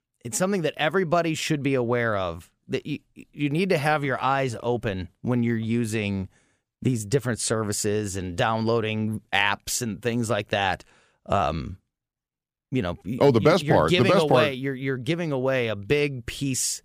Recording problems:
none

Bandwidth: 15 kHz